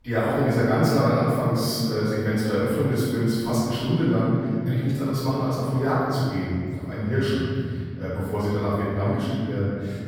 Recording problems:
room echo; strong; dies away in 2.5 s
off-mic speech; far

